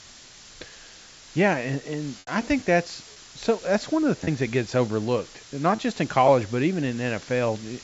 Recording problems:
high frequencies cut off; noticeable; nothing above 8 kHz
muffled; very slightly; fading above 3.5 kHz
hiss; noticeable; throughout; 20 dB below the speech
choppy; occasionally; 2% of the speech affected

